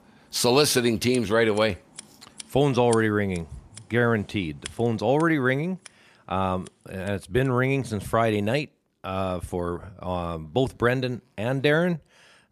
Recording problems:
household noises; faint; throughout; 20 dB below the speech

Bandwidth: 15 kHz